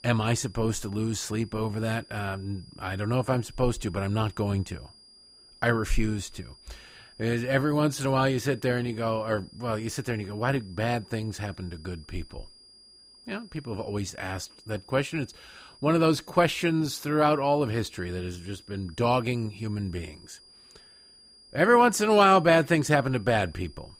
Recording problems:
high-pitched whine; faint; throughout; 5 kHz, 25 dB below the speech

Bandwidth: 15.5 kHz